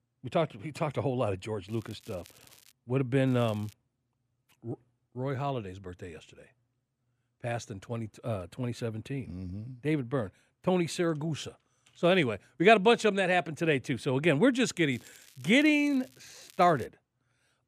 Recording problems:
crackling; faint; from 1.5 to 2.5 s, at 3.5 s and from 15 to 17 s; 25 dB below the speech

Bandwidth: 14.5 kHz